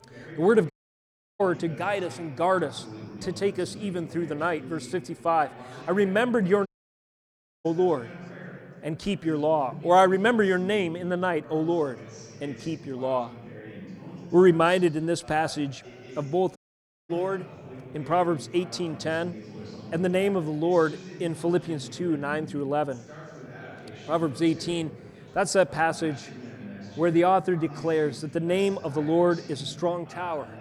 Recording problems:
chatter from many people; noticeable; throughout; 15 dB below the speech
audio cutting out; at 0.5 s for 0.5 s, at 6.5 s for 1 s and at 17 s for 0.5 s

